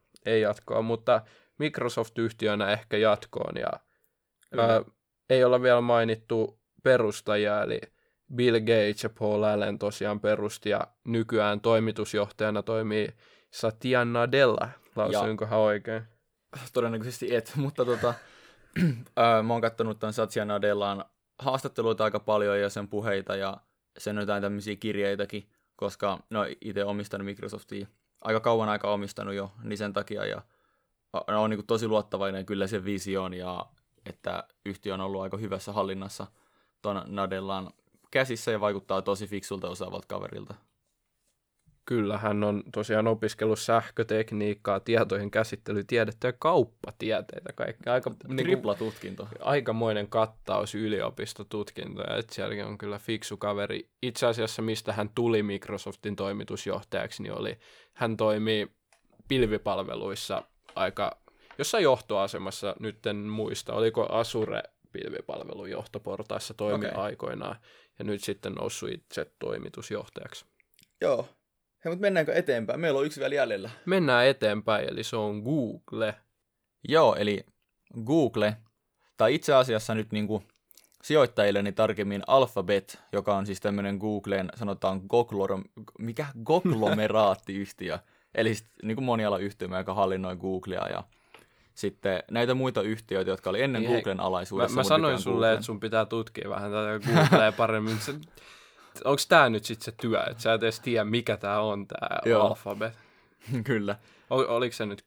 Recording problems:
none

